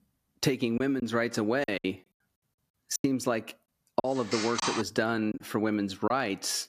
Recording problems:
squashed, flat; somewhat
choppy; very; 7% of the speech affected
phone ringing; noticeable; at 4 s; peak 1 dB below the speech

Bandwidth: 14.5 kHz